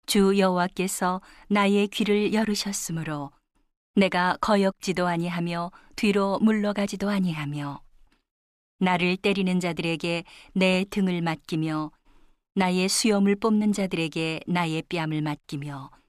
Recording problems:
none

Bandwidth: 14.5 kHz